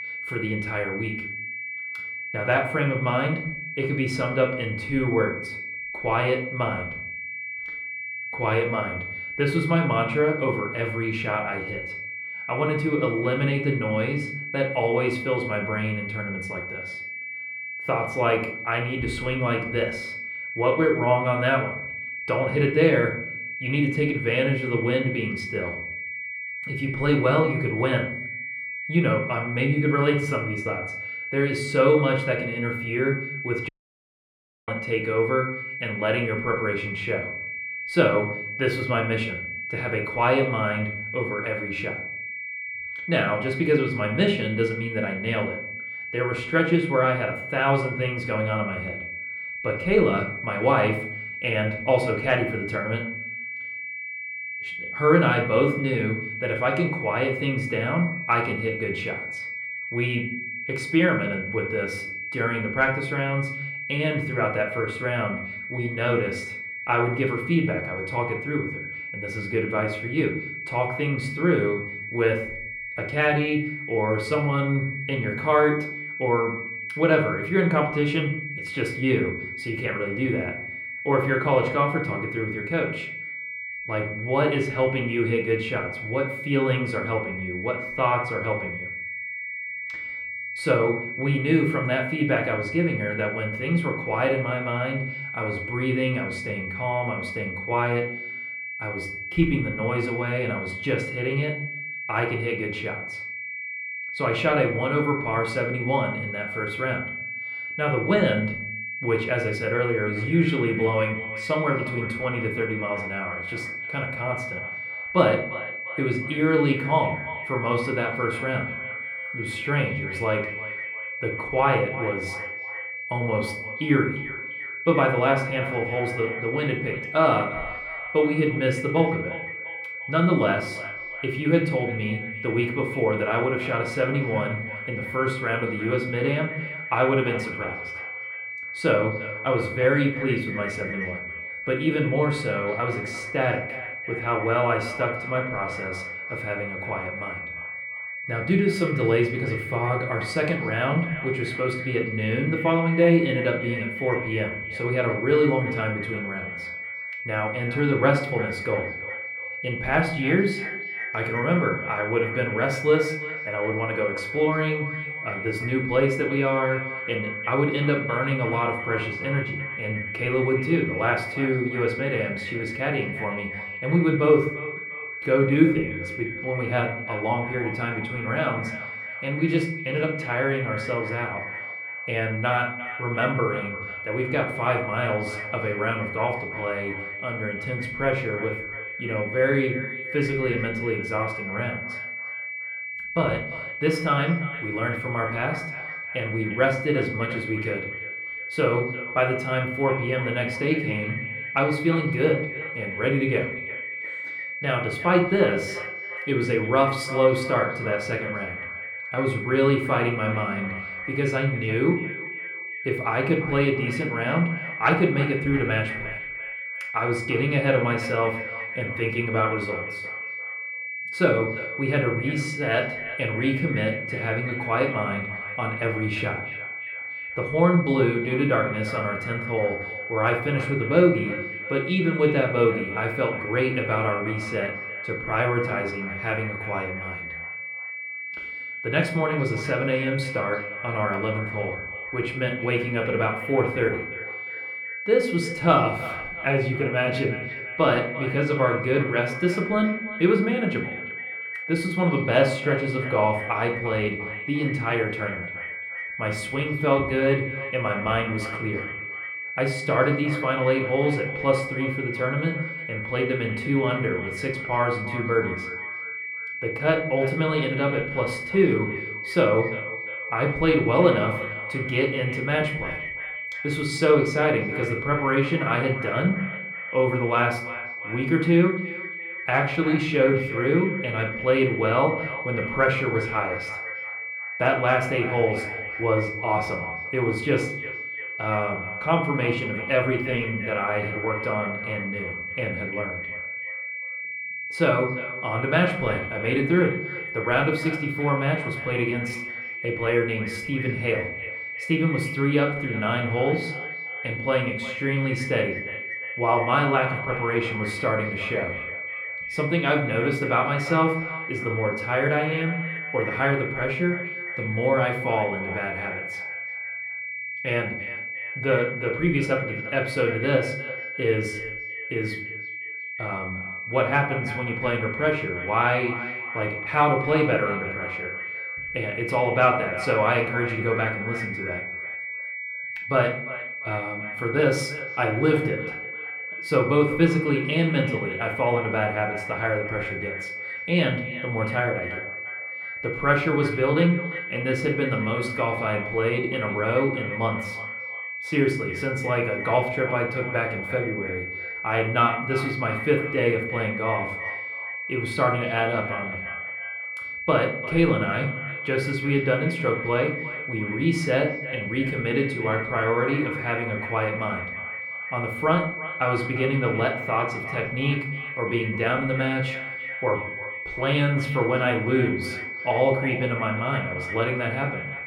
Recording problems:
echo of what is said; noticeable; from 1:50 on; 350 ms later, 15 dB below the speech
muffled; slightly; fading above 4 kHz
room echo; slight; dies away in 0.5 s
off-mic speech; somewhat distant
high-pitched whine; loud; throughout; 2.5 kHz, 6 dB below the speech
audio cutting out; at 34 s for 1 s

